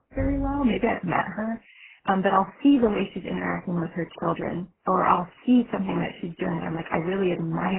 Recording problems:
garbled, watery; badly
door banging; noticeable; at the start; peak 7 dB below the speech
abrupt cut into speech; at the end

